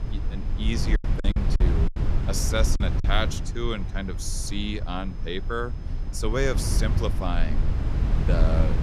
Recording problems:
low rumble; loud; throughout; 8 dB below the speech
high-pitched whine; faint; throughout; 5 kHz, 30 dB below the speech
choppy; very; from 1 to 3 s; 14% of the speech affected

